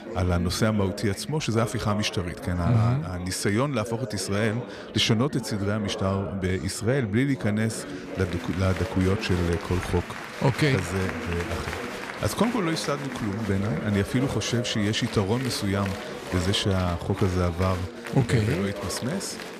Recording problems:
chatter from many people; loud; throughout; 9 dB below the speech

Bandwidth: 14.5 kHz